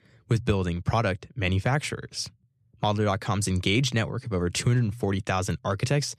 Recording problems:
none

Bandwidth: 13.5 kHz